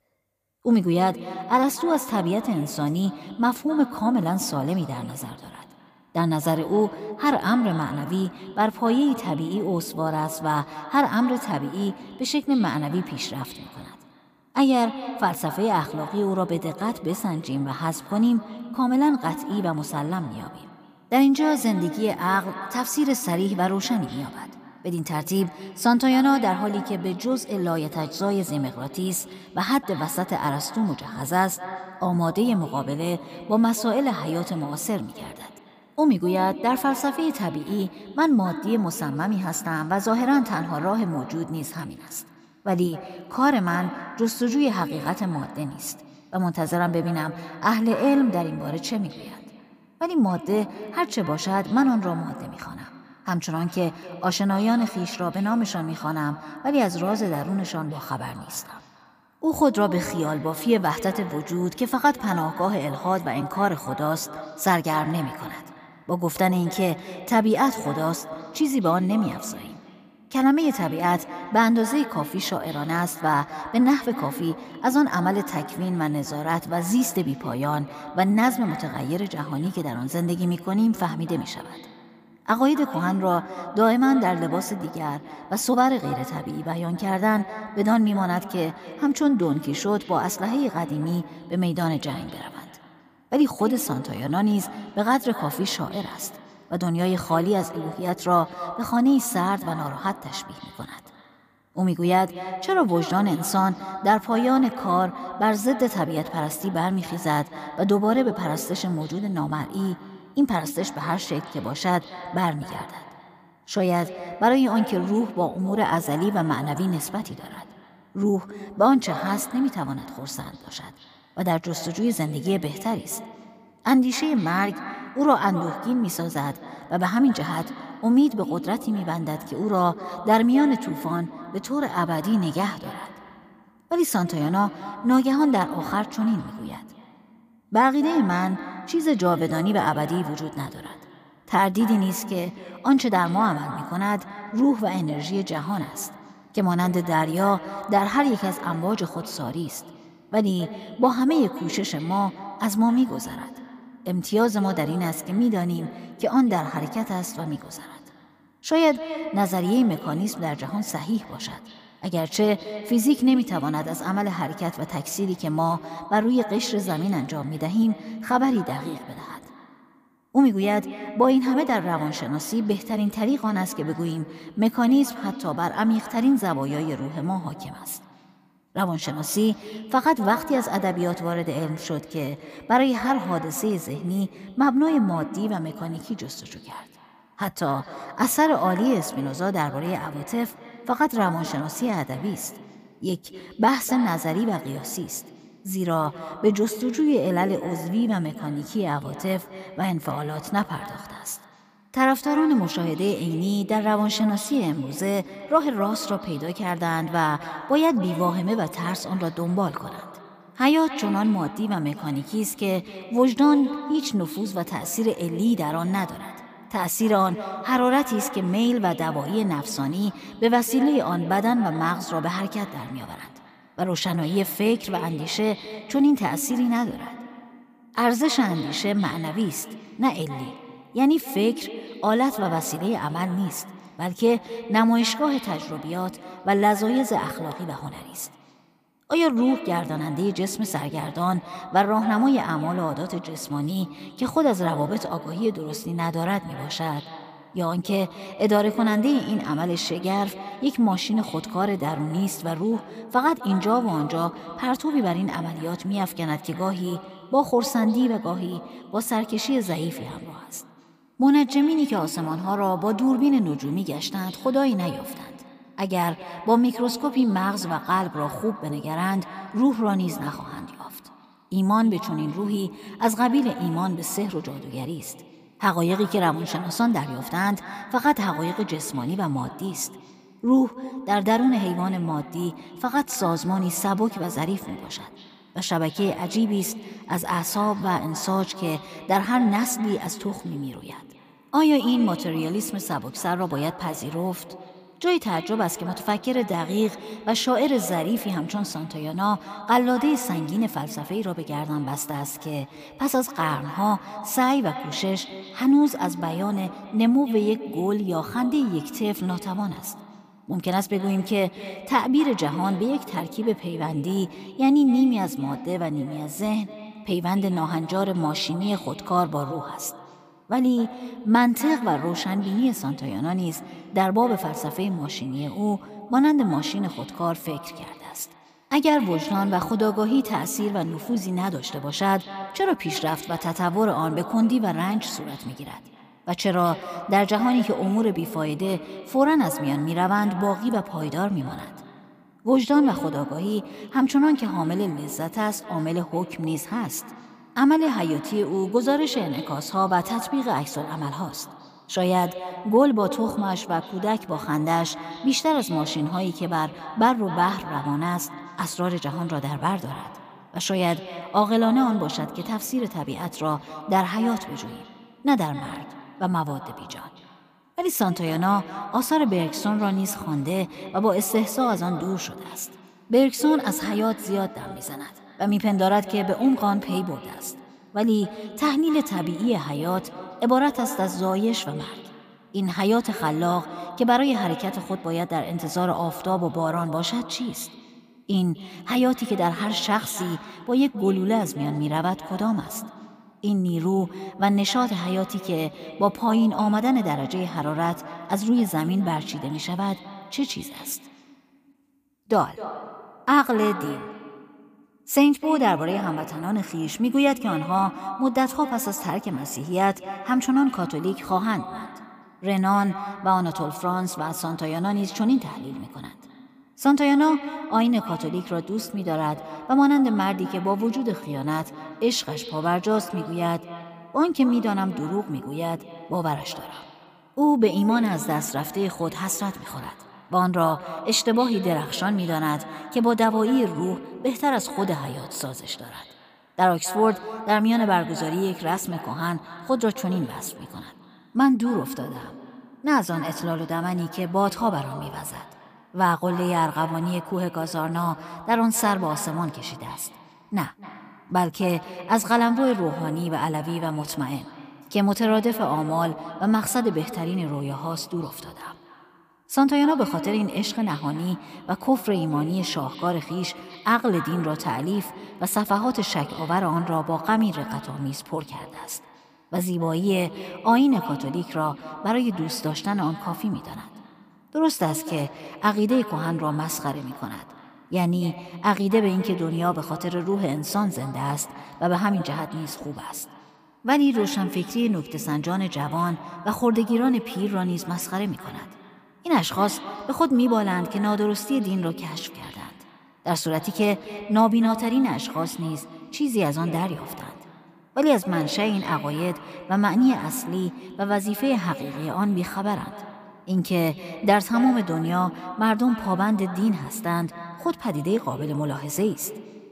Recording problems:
echo of what is said; noticeable; throughout; 260 ms later, 15 dB below the speech

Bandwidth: 15 kHz